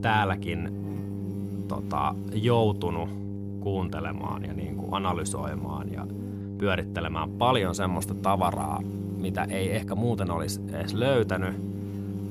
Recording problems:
electrical hum; noticeable; throughout; 50 Hz, 10 dB below the speech

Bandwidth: 15 kHz